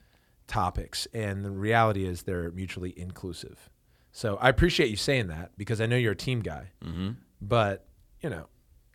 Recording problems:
none

